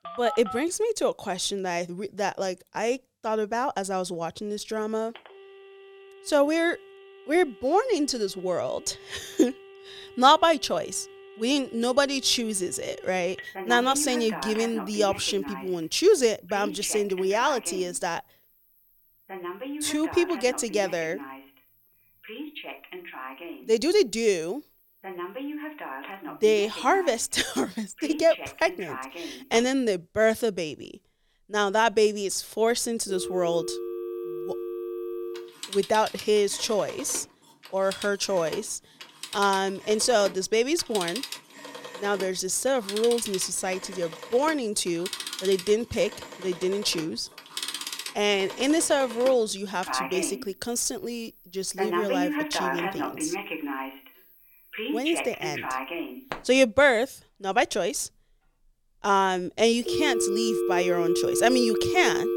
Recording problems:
alarms or sirens; loud; throughout; 8 dB below the speech

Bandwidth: 18 kHz